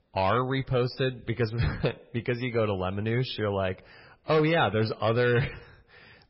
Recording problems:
garbled, watery; badly; nothing above 5.5 kHz
distortion; slight; 4% of the sound clipped

